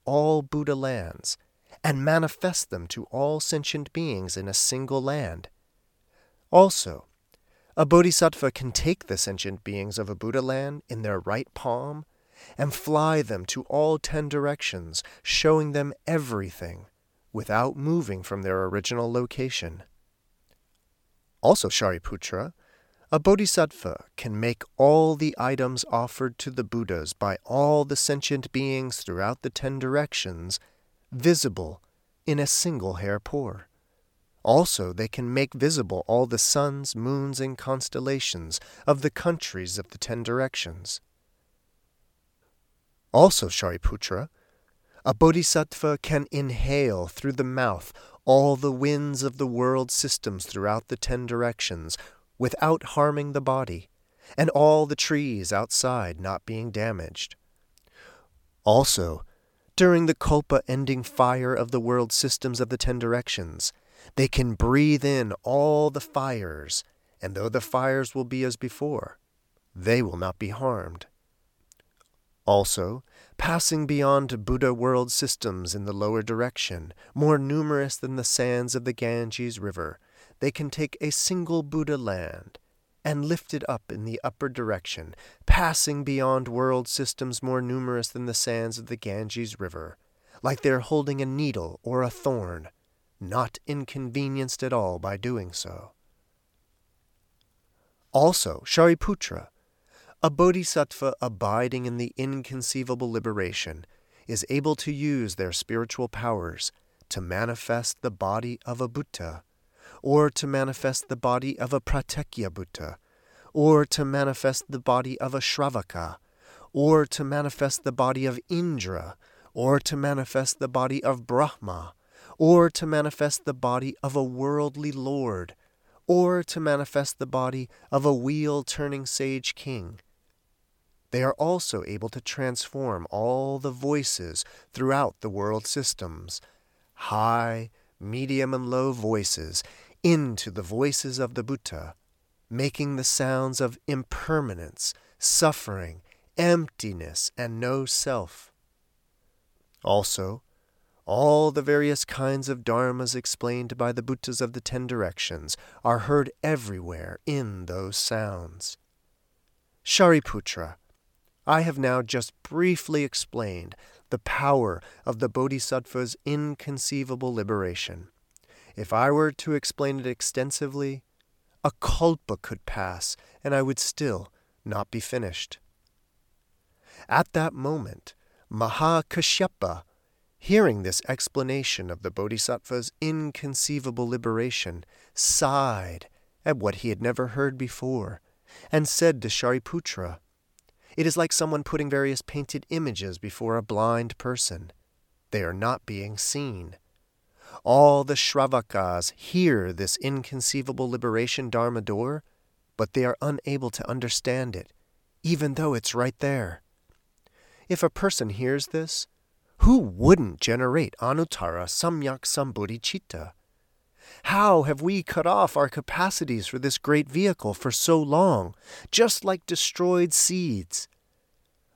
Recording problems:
uneven, jittery; strongly; from 21 s to 3:12

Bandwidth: 18 kHz